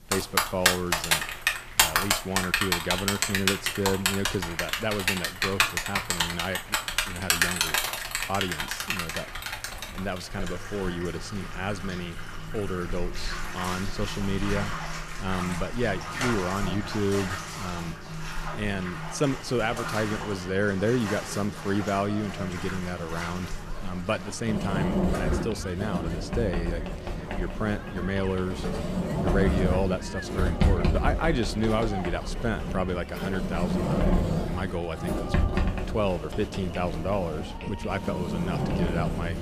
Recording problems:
echo of what is said; faint; throughout; 160 ms later, 20 dB below the speech
household noises; very loud; throughout; 1 dB above the speech
crowd noise; noticeable; throughout; 15 dB below the speech

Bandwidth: 14.5 kHz